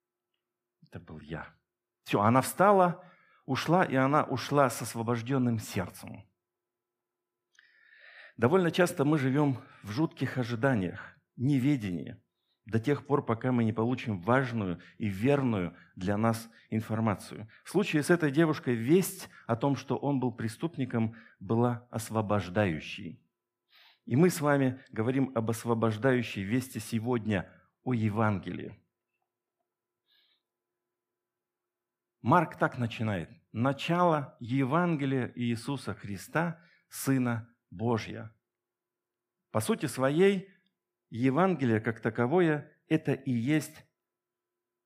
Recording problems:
none

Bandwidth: 15 kHz